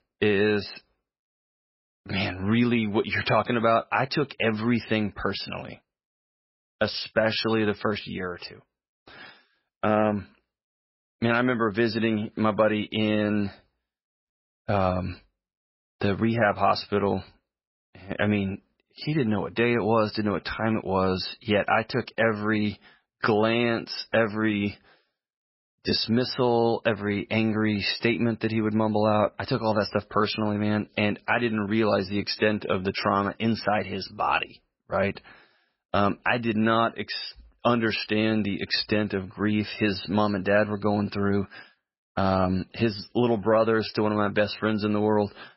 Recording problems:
garbled, watery; badly; nothing above 5.5 kHz

